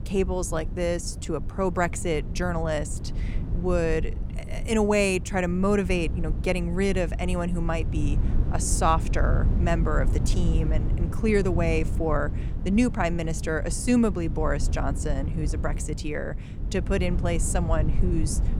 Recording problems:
wind noise on the microphone; occasional gusts; 15 dB below the speech

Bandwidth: 17.5 kHz